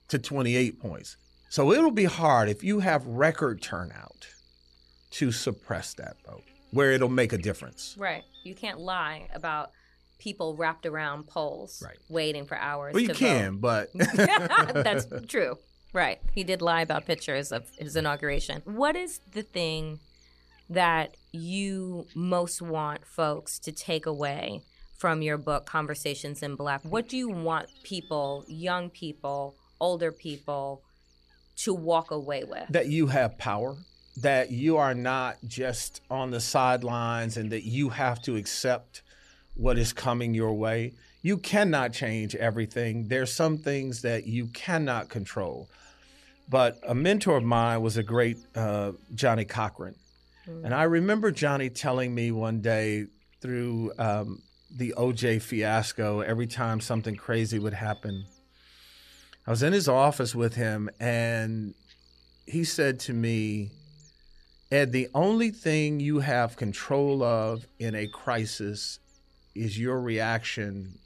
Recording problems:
electrical hum; faint; throughout; 60 Hz, 30 dB below the speech

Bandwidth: 13.5 kHz